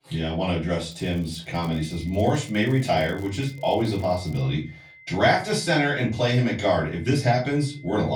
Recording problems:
off-mic speech; far
room echo; slight; dies away in 0.3 s
high-pitched whine; faint; from 1.5 s on; 2 kHz, 25 dB below the speech
crackling; faint; from 1 to 4.5 s; 30 dB below the speech
abrupt cut into speech; at the end

